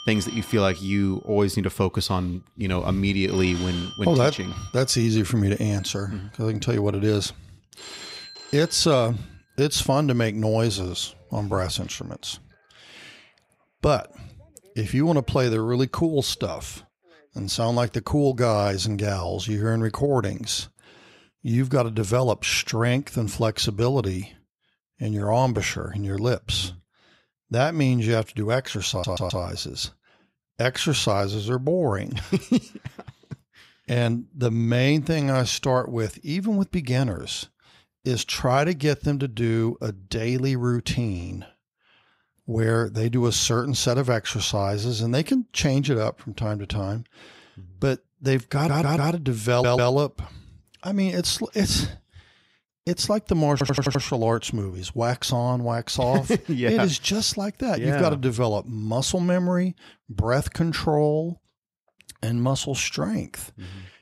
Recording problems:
alarms or sirens; noticeable; until 18 s; 15 dB below the speech
audio stuttering; 4 times, first at 29 s

